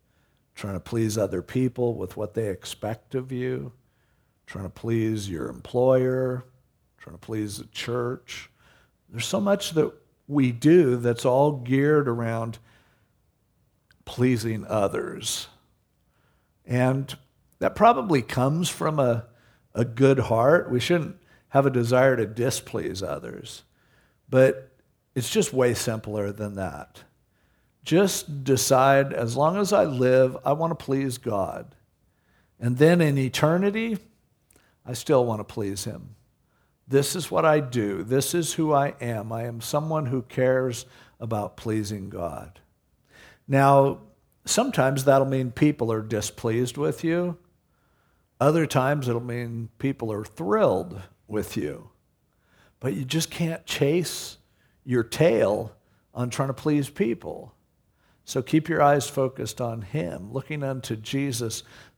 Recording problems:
none

